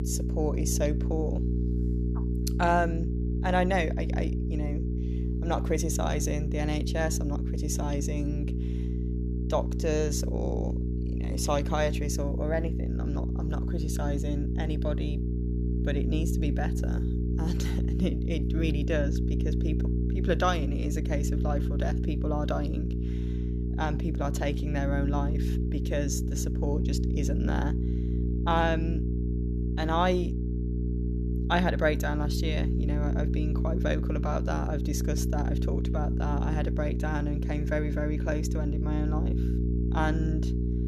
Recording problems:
electrical hum; loud; throughout; 60 Hz, 7 dB below the speech

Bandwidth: 13.5 kHz